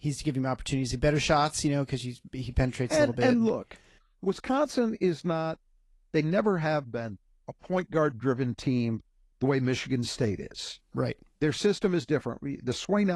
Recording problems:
garbled, watery; slightly
abrupt cut into speech; at the end

